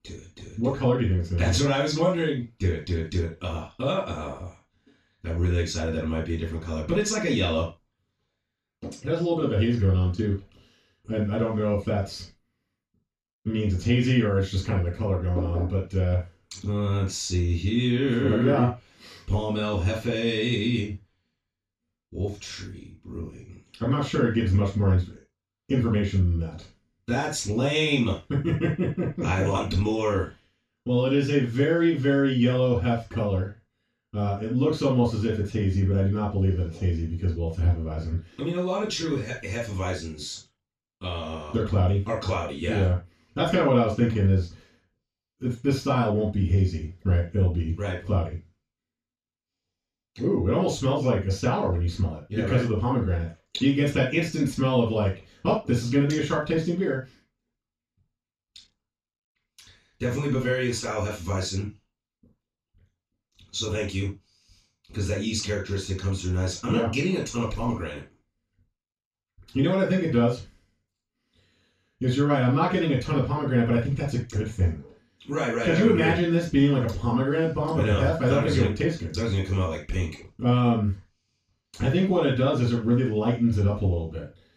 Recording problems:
off-mic speech; far
room echo; noticeable; dies away in 0.2 s

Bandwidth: 14 kHz